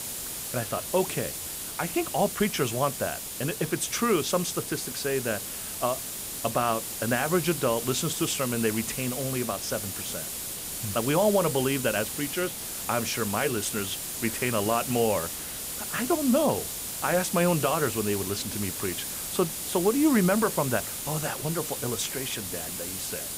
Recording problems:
hiss; loud; throughout; 4 dB below the speech

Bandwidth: 15.5 kHz